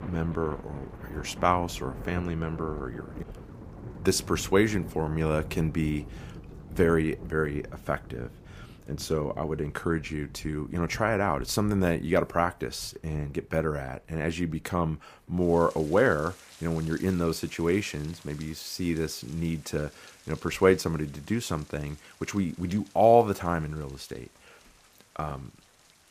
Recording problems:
rain or running water; noticeable; throughout; 15 dB below the speech

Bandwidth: 15 kHz